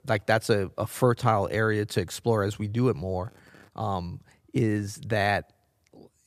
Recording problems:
none

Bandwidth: 14.5 kHz